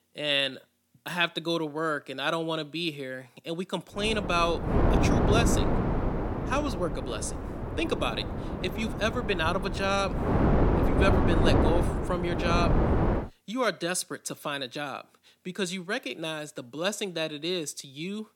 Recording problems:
wind noise on the microphone; heavy; from 4 to 13 s; 2 dB below the speech

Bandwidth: 18 kHz